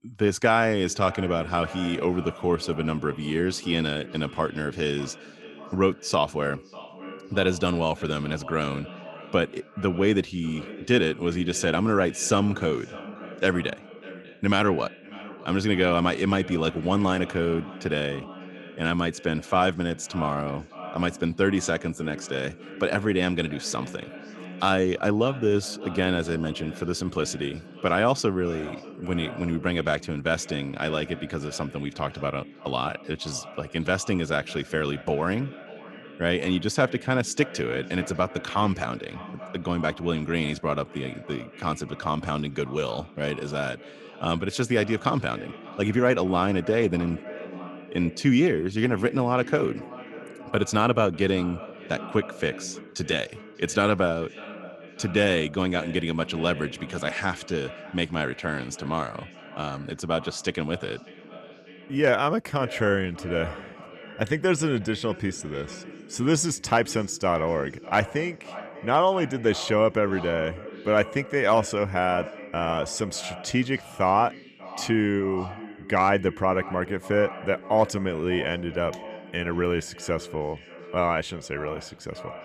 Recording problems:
echo of what is said; noticeable; throughout; 590 ms later, 15 dB below the speech

